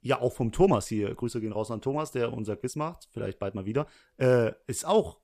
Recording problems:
uneven, jittery; strongly; from 0.5 to 4.5 s

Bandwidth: 14.5 kHz